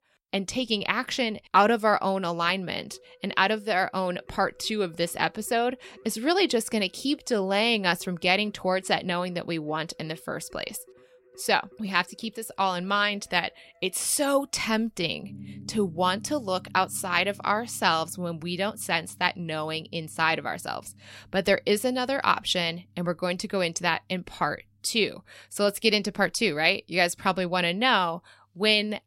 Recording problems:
background music; faint; throughout; 25 dB below the speech

